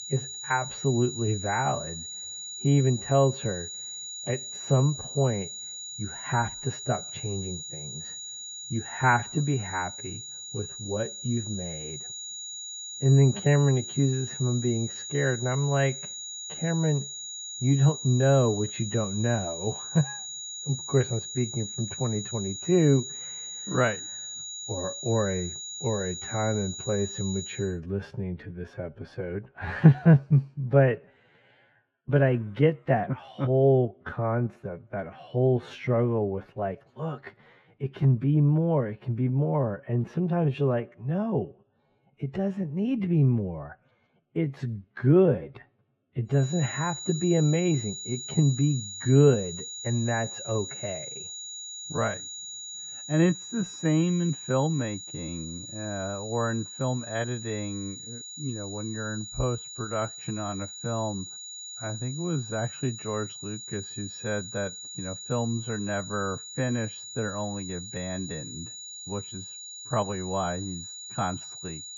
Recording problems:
muffled; very; fading above 1.5 kHz
wrong speed, natural pitch; too slow; 0.7 times normal speed
high-pitched whine; loud; until 28 s and from 46 s on; 7 kHz, 9 dB below the speech

